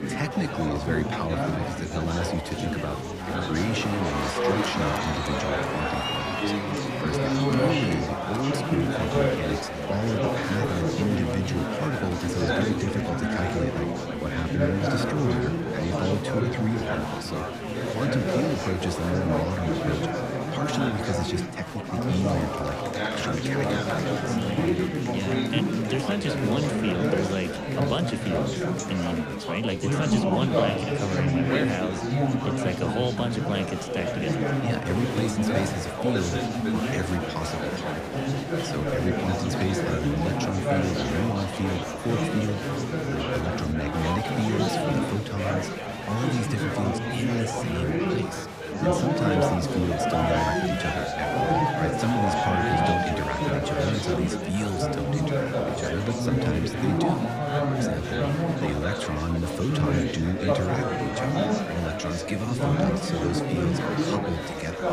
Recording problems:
chatter from many people; very loud; throughout; 3 dB above the speech

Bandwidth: 15 kHz